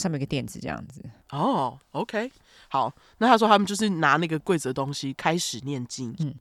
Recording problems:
abrupt cut into speech; at the start

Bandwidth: 18.5 kHz